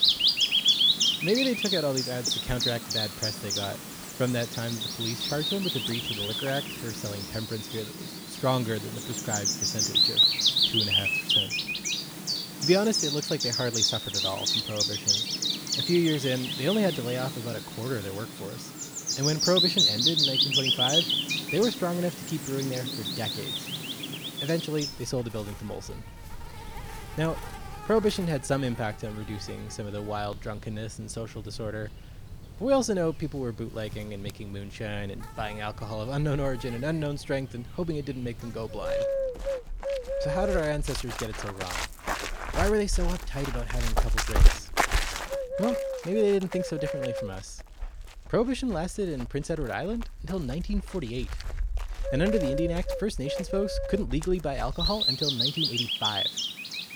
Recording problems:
animal sounds; very loud; throughout; 4 dB above the speech

